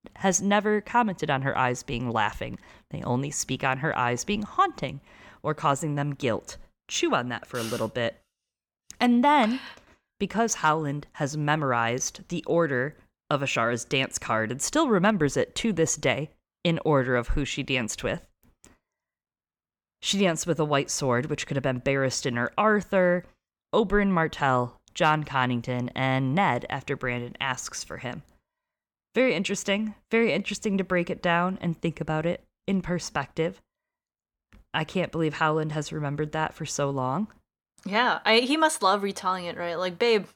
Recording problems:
none

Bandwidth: 18 kHz